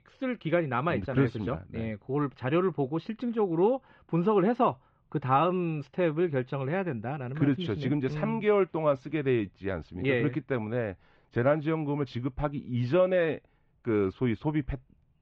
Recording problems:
muffled; very; fading above 3 kHz

